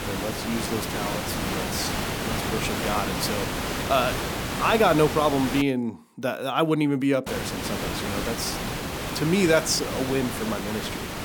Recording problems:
hiss; loud; until 5.5 s and from 7.5 s on; 3 dB below the speech

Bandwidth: 18.5 kHz